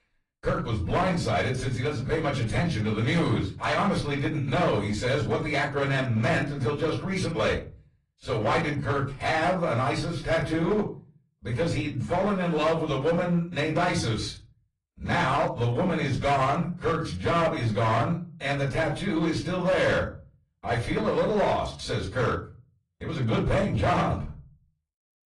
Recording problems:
off-mic speech; far
distortion; slight; 9% of the sound clipped
room echo; very slight; dies away in 0.4 s
garbled, watery; slightly; nothing above 10.5 kHz

